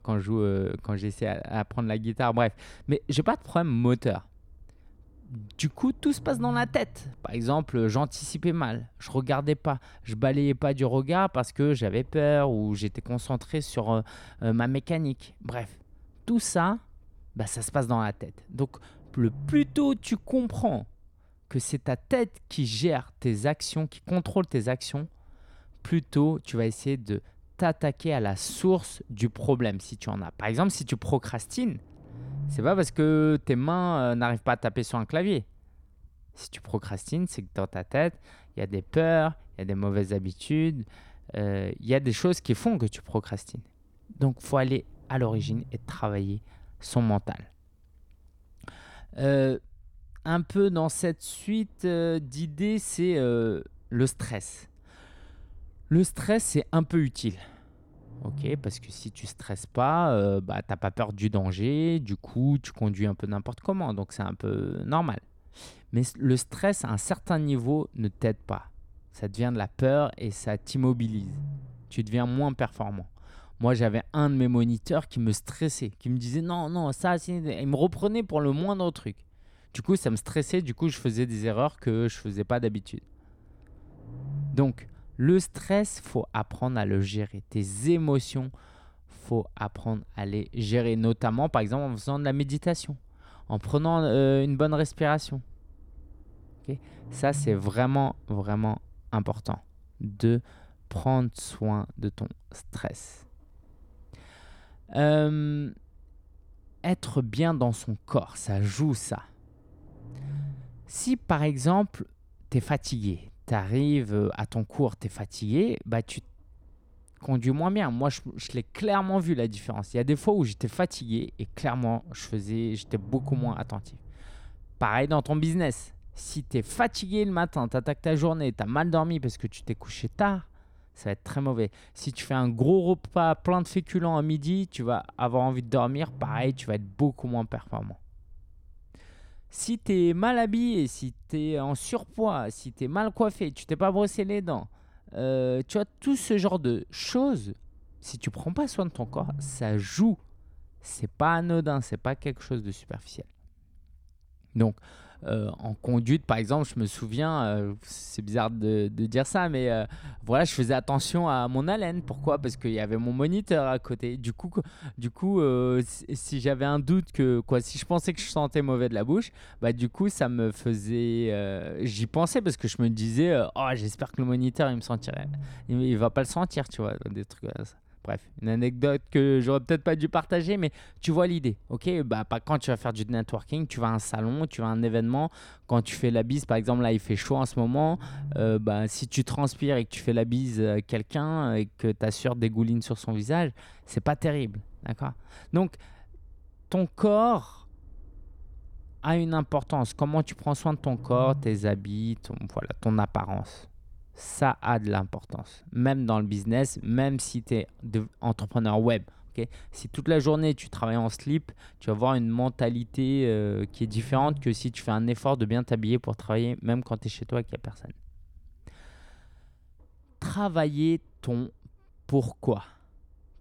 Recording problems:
low rumble; faint; throughout; 25 dB below the speech

